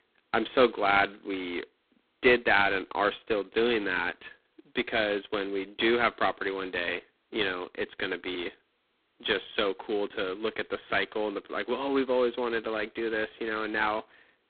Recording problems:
phone-call audio; poor line; nothing above 4 kHz

